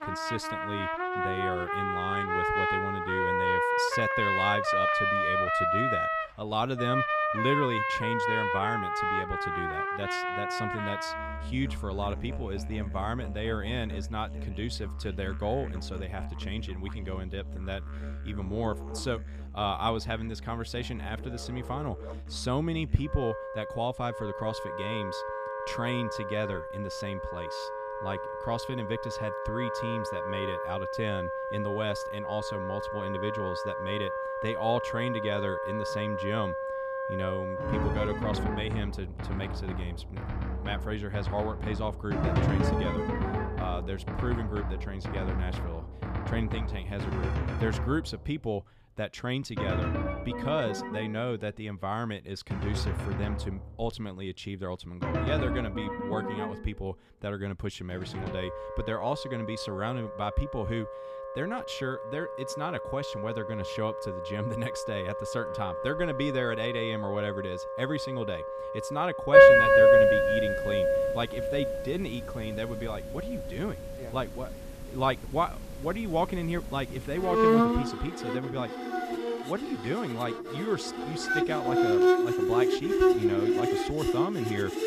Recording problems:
background music; very loud; throughout; 5 dB above the speech

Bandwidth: 14.5 kHz